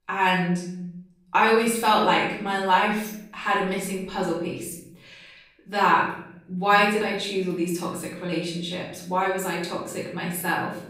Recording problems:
off-mic speech; far
room echo; noticeable; dies away in 0.7 s

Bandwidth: 15.5 kHz